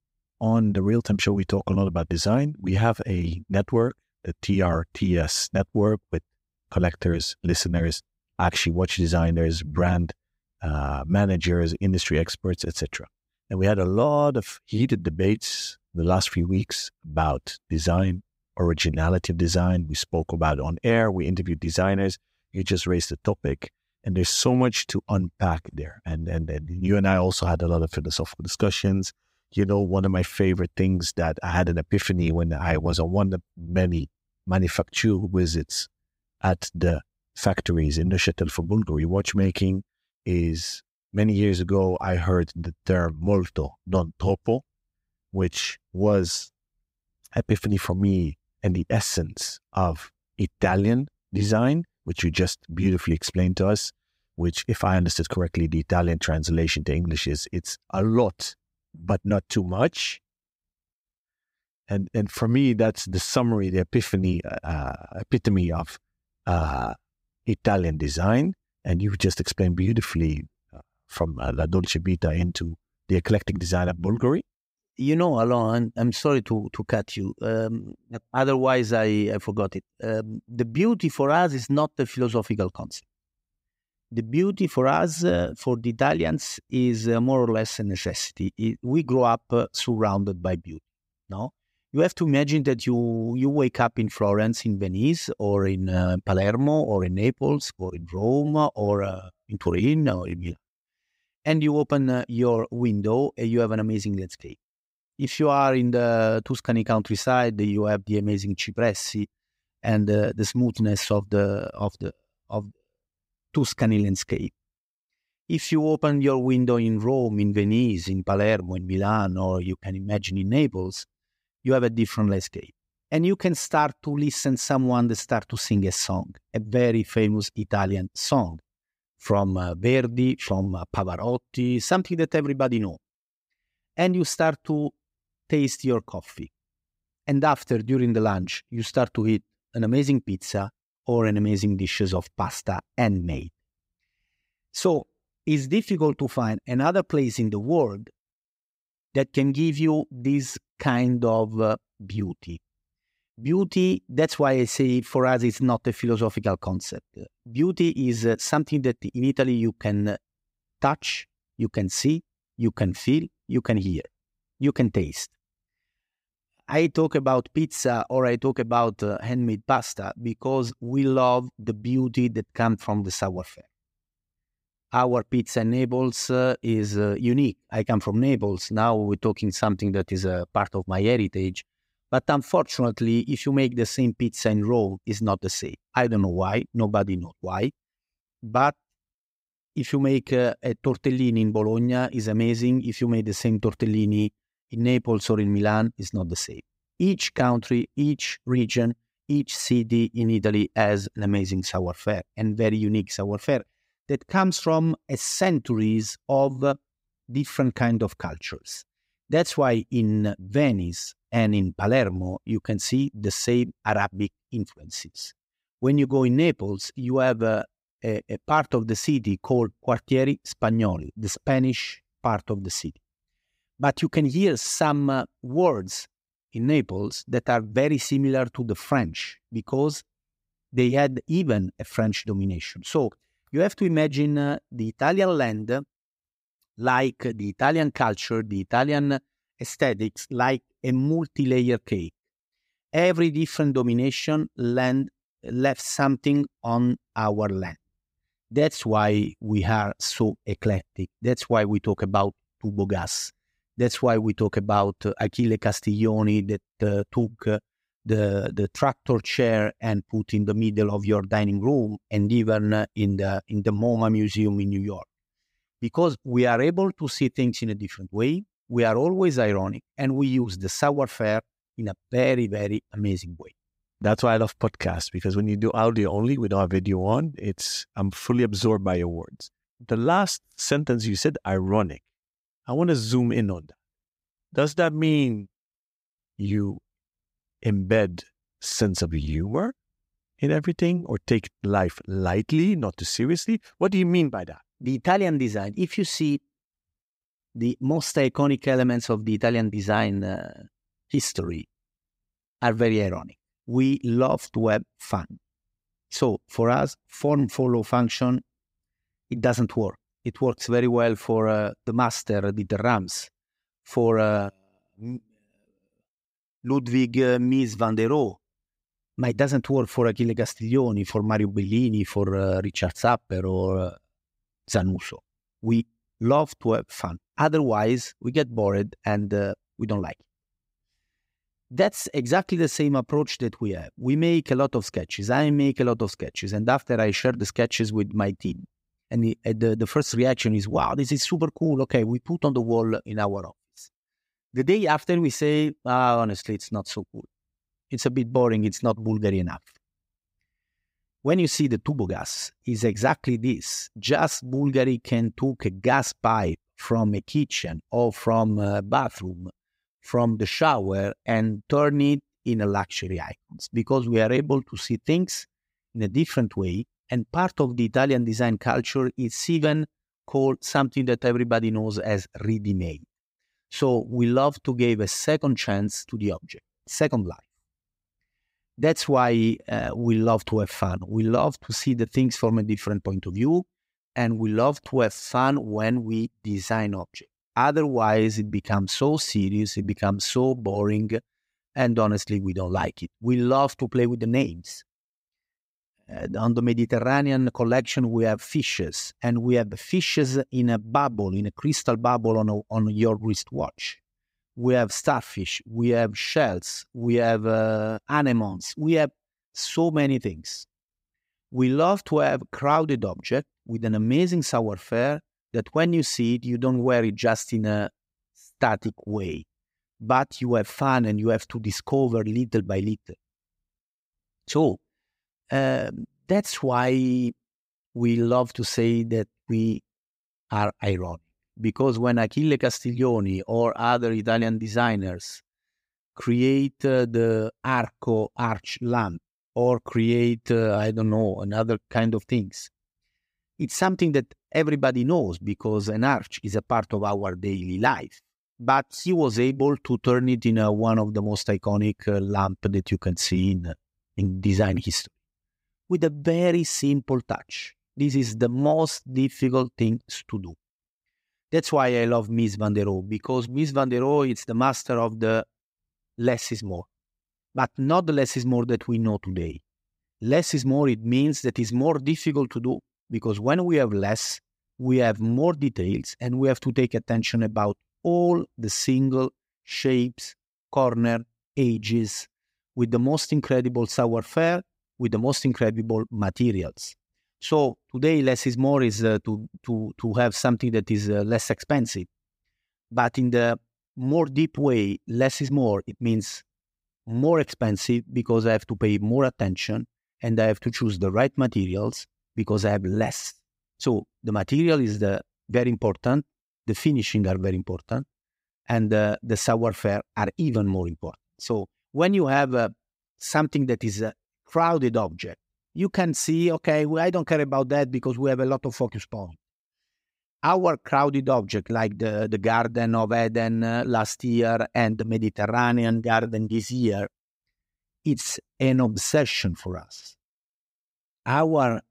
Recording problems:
none

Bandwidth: 15.5 kHz